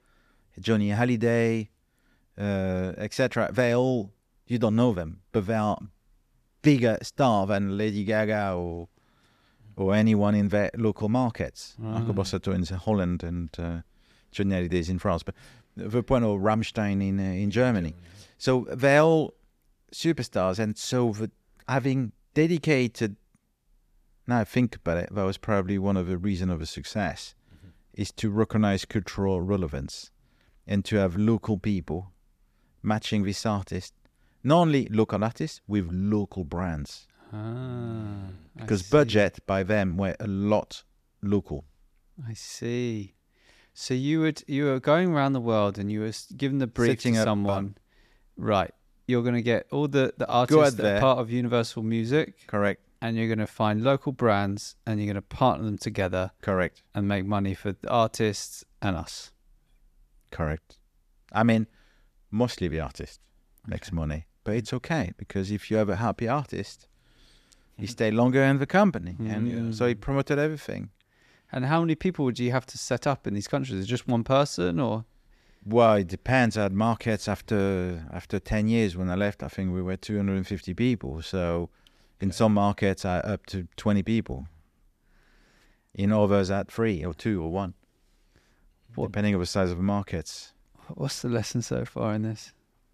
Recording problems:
none

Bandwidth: 14.5 kHz